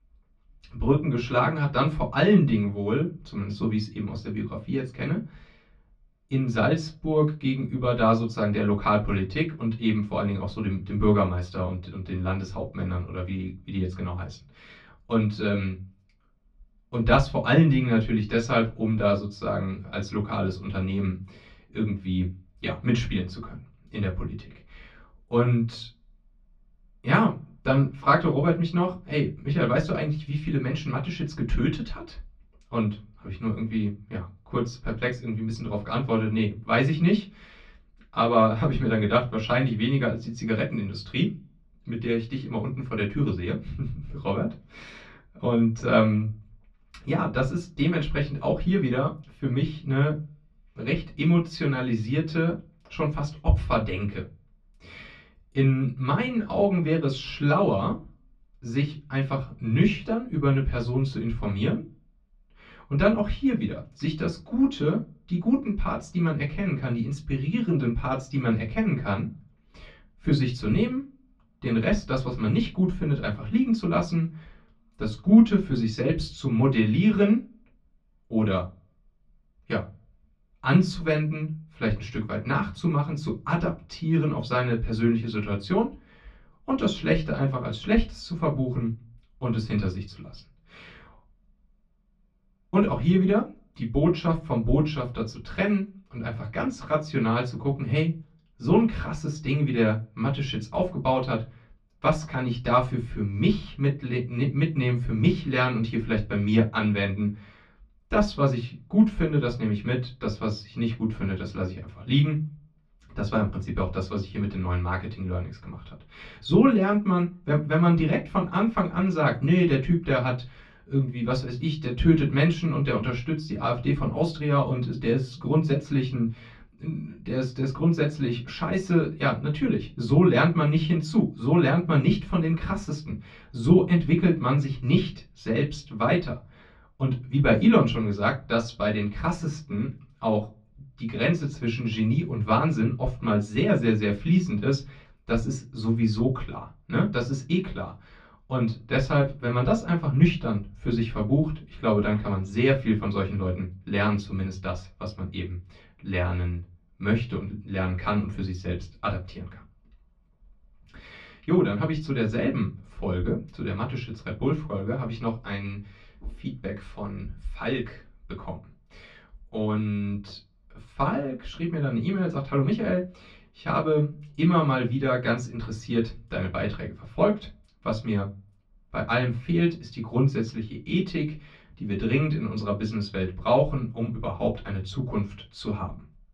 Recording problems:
off-mic speech; far
muffled; slightly; fading above 3 kHz
room echo; very slight; dies away in 0.2 s

